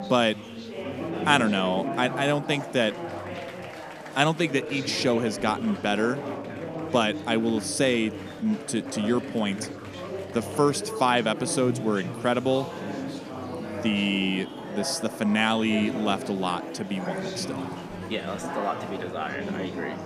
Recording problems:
chatter from many people; loud; throughout; 8 dB below the speech

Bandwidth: 14.5 kHz